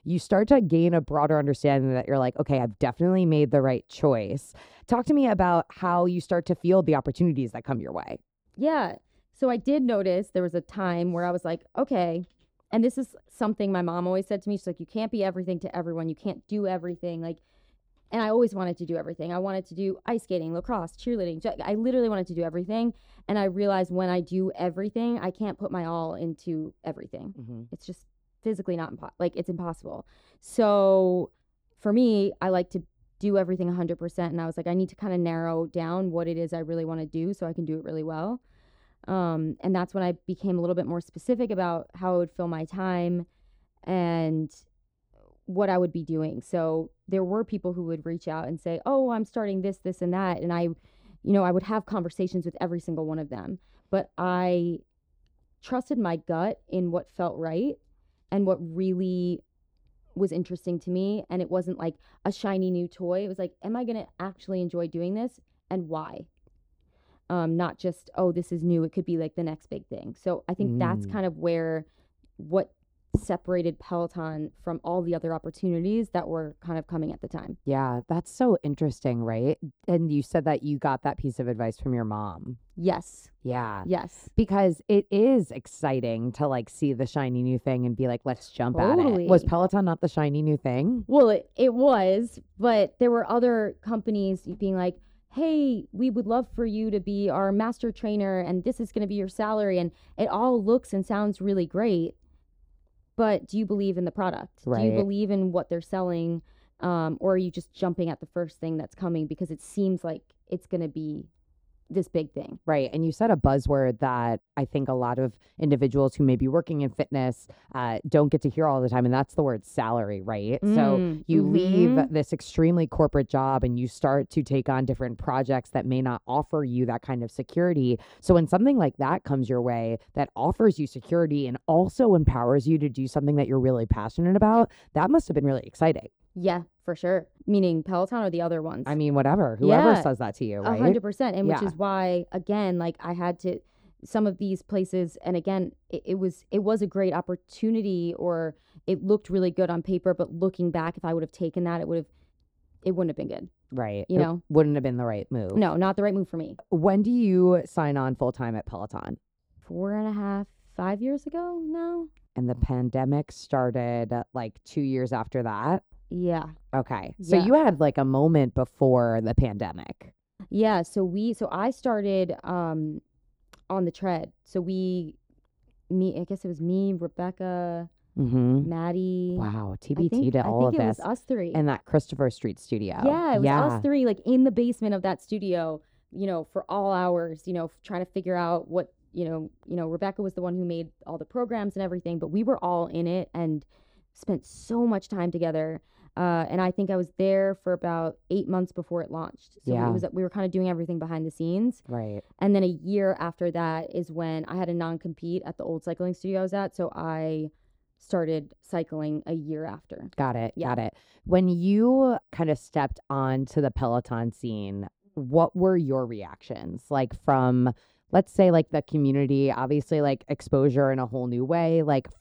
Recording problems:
muffled; slightly; fading above 1 kHz

